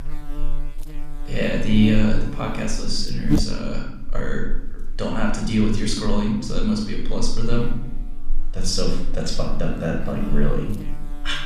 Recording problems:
room echo; noticeable; dies away in 0.7 s
off-mic speech; somewhat distant
electrical hum; noticeable; throughout; 50 Hz, 10 dB below the speech

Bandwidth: 14.5 kHz